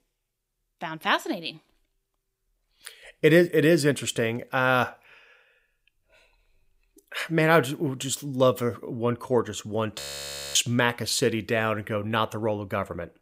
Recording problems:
audio freezing; at 10 s for 0.5 s

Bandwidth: 15.5 kHz